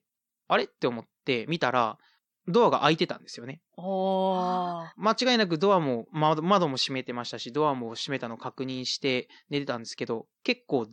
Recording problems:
none

